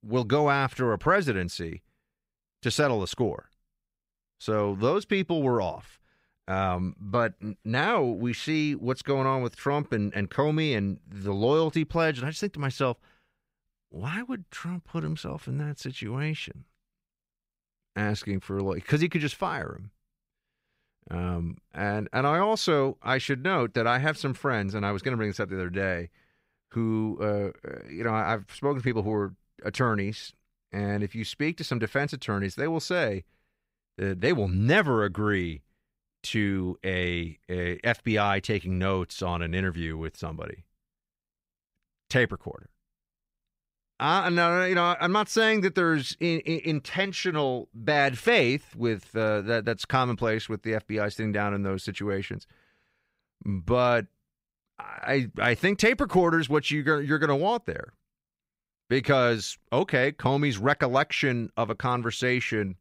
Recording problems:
none

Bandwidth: 15.5 kHz